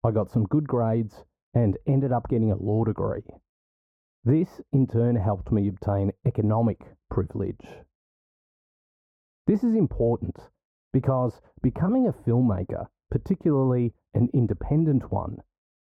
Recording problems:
muffled; very; fading above 1.5 kHz

